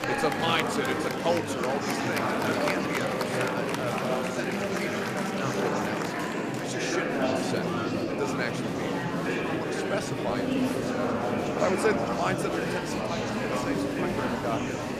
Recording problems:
murmuring crowd; very loud; throughout; 5 dB above the speech

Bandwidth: 15 kHz